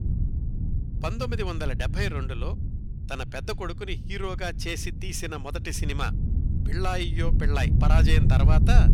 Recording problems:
wind noise on the microphone; heavy; 8 dB below the speech

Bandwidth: 18.5 kHz